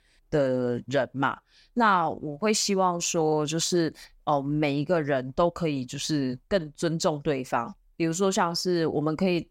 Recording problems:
none

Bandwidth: 16 kHz